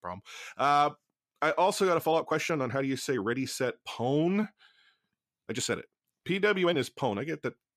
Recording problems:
uneven, jittery; strongly; from 0.5 to 7 s

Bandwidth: 14.5 kHz